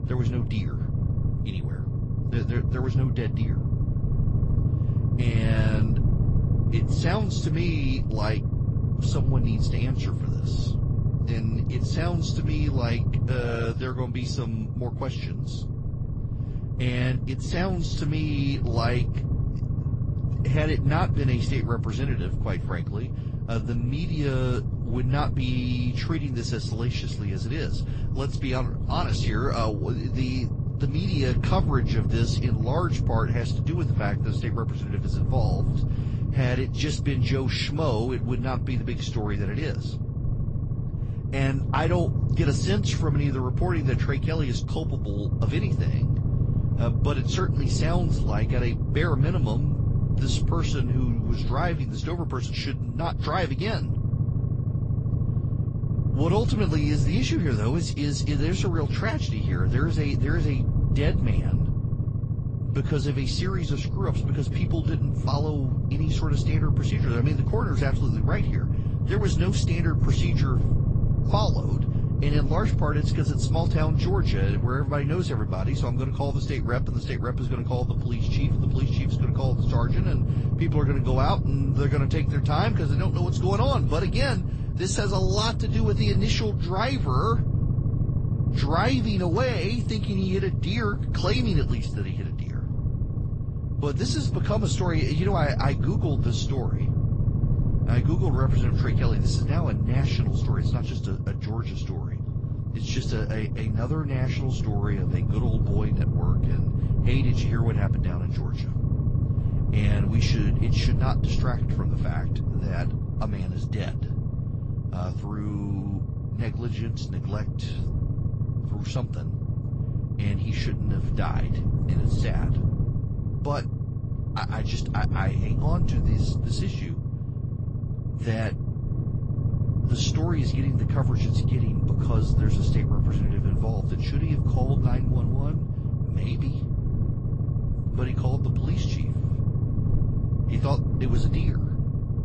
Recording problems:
garbled, watery; slightly; nothing above 8 kHz
low rumble; loud; throughout; 5 dB below the speech

